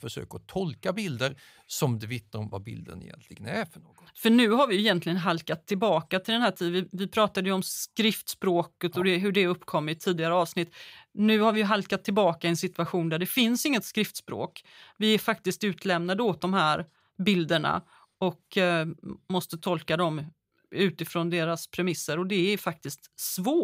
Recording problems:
abrupt cut into speech; at the end

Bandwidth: 15.5 kHz